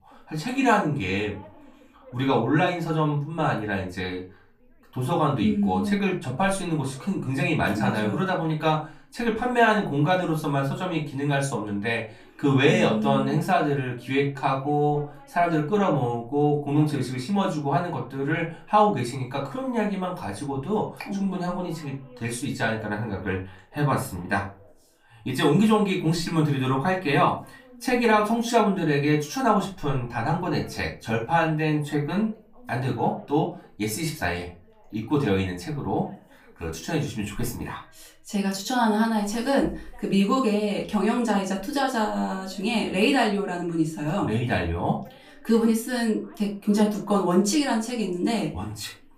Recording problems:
off-mic speech; far
room echo; slight; dies away in 0.3 s
voice in the background; faint; throughout; 30 dB below the speech

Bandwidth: 15 kHz